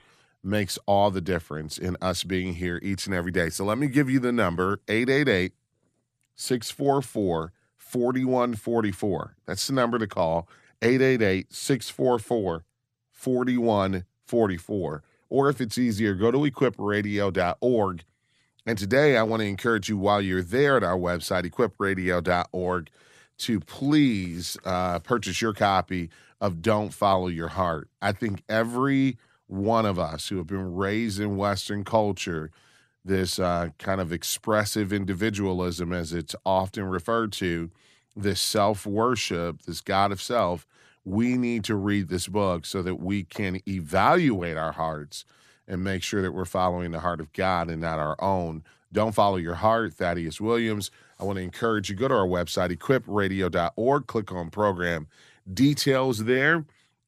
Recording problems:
none

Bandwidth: 14 kHz